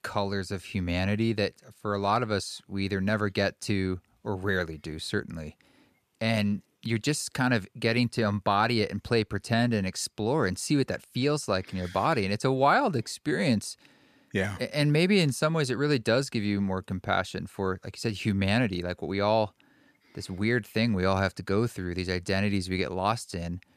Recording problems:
none

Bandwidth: 14.5 kHz